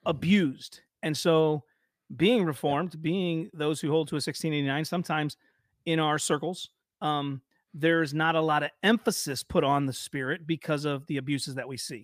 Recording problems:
none

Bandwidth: 15 kHz